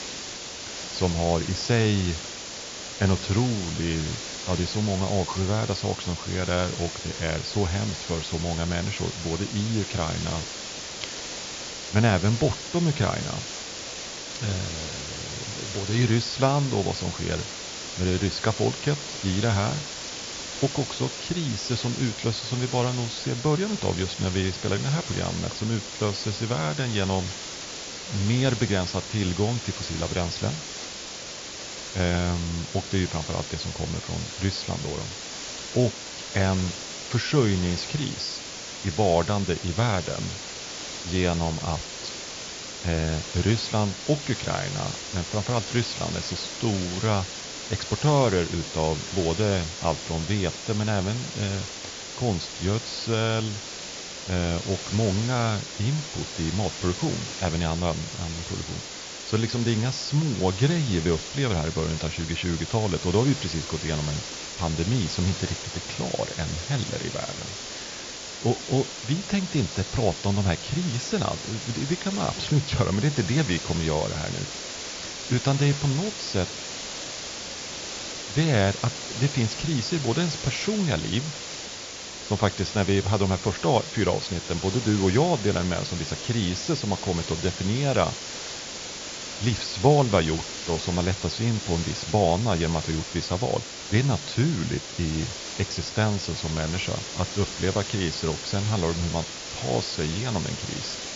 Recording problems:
high frequencies cut off; noticeable; nothing above 7.5 kHz
hiss; loud; throughout; 7 dB below the speech

